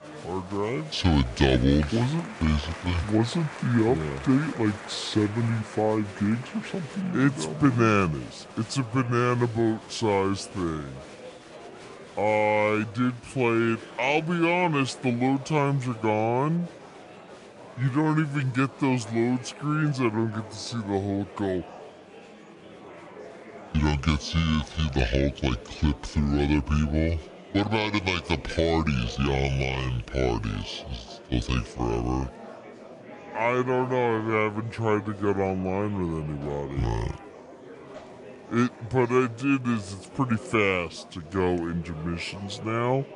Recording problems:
wrong speed and pitch; too slow and too low; 0.7 times normal speed
murmuring crowd; noticeable; throughout; 15 dB below the speech

